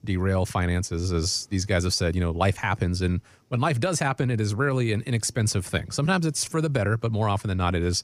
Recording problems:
none

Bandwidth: 15 kHz